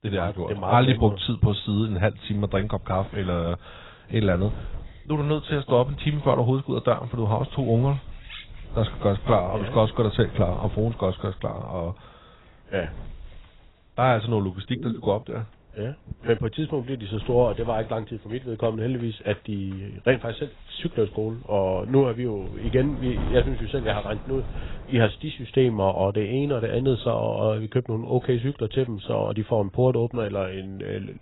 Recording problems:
garbled, watery; badly; nothing above 4 kHz
wind noise on the microphone; occasional gusts; 20 dB below the speech
animal sounds; faint; from 7.5 s on; 25 dB below the speech

